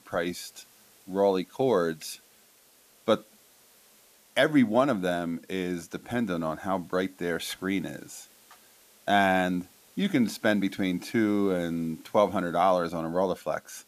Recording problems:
hiss; faint; throughout; 30 dB below the speech

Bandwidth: 14.5 kHz